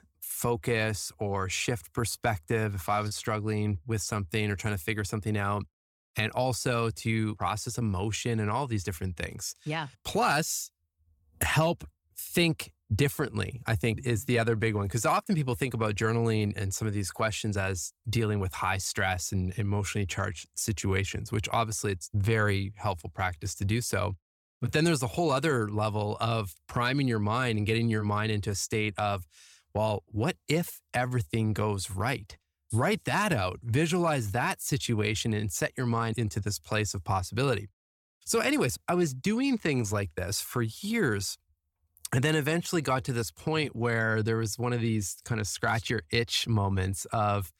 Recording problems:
none

